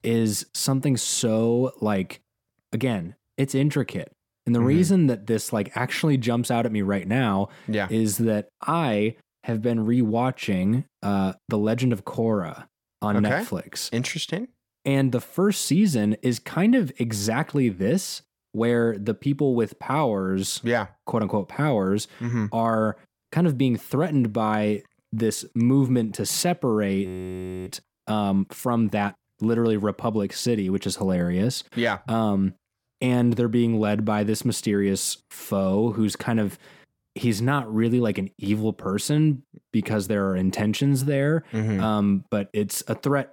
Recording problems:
audio freezing; at 27 s for 0.5 s

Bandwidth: 17 kHz